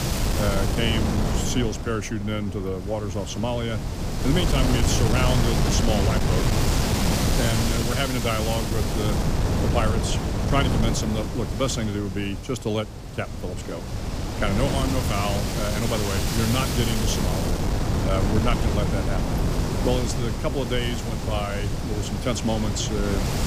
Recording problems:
wind noise on the microphone; heavy; 1 dB below the speech

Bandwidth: 15 kHz